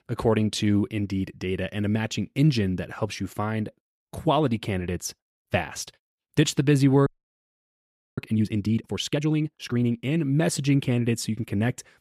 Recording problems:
audio freezing; at 7 s for 1 s

